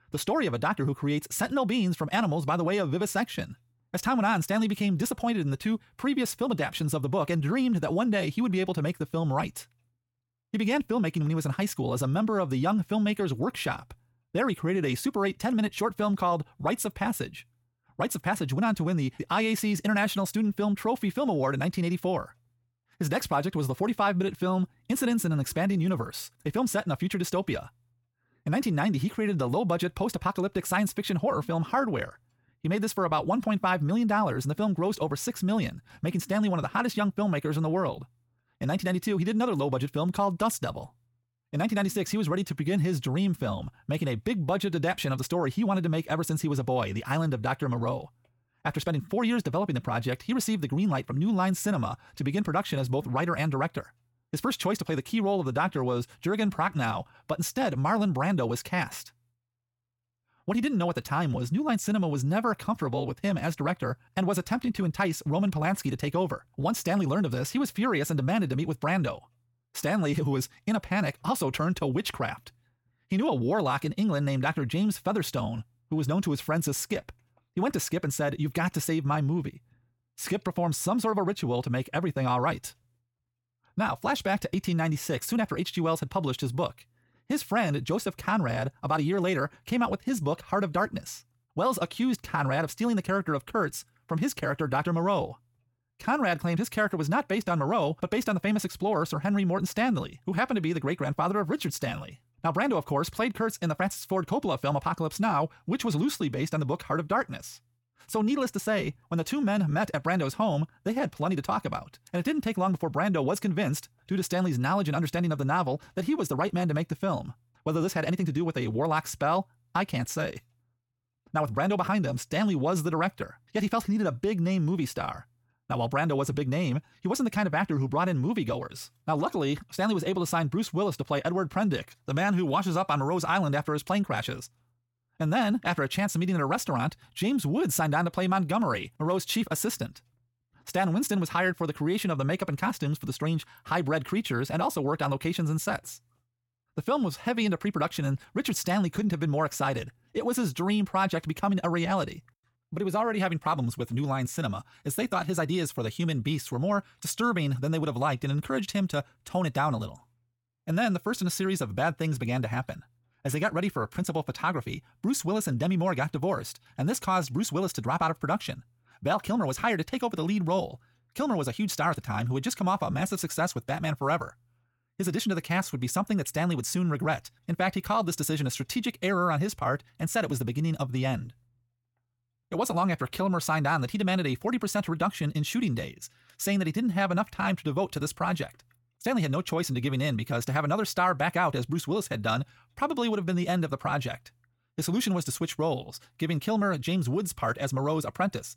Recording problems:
wrong speed, natural pitch; too fast; 1.6 times normal speed

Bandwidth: 17 kHz